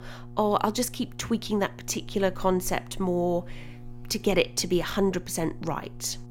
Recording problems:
electrical hum; faint; throughout; 60 Hz, 25 dB below the speech

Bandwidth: 16 kHz